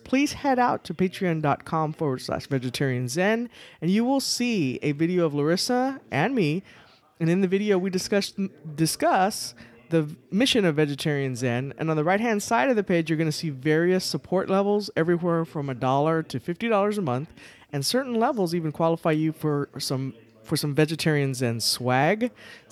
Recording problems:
background chatter; faint; throughout; 2 voices, 30 dB below the speech

